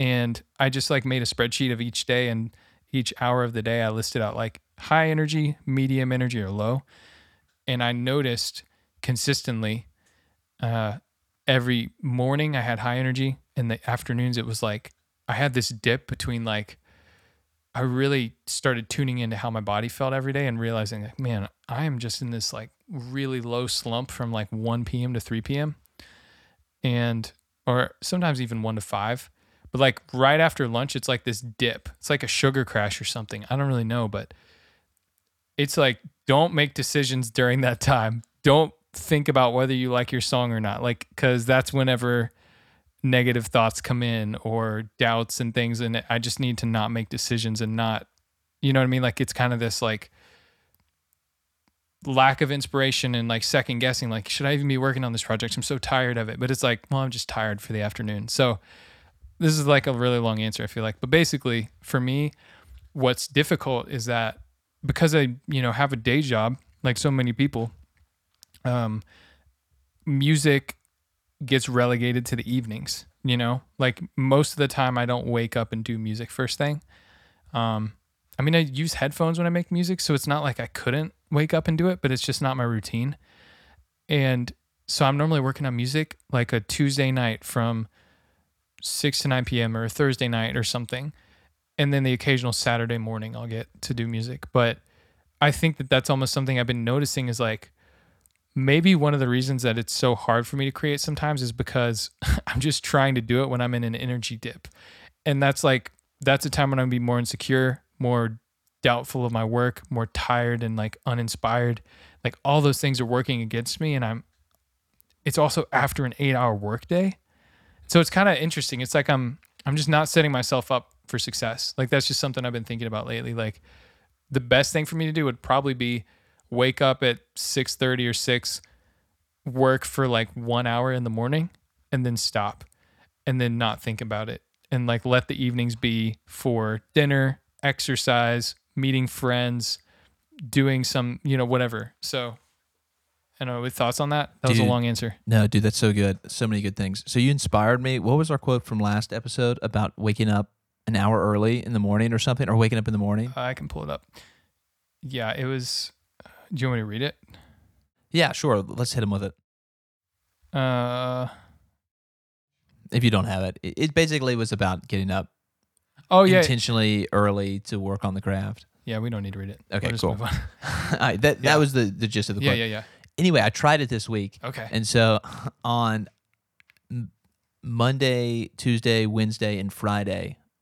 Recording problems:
abrupt cut into speech; at the start

